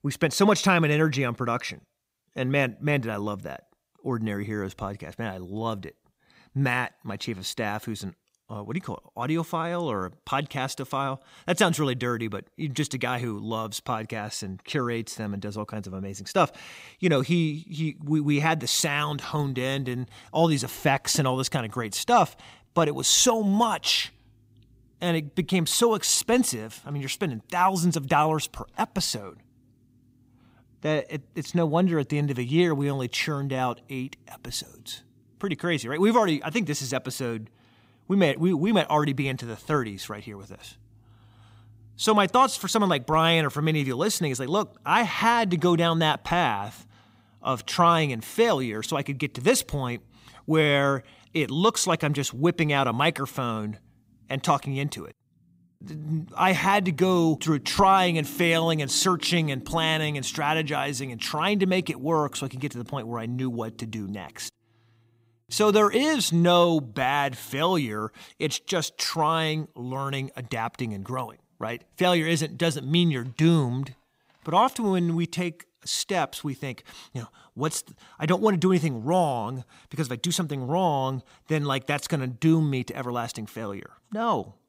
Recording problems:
none

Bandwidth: 15.5 kHz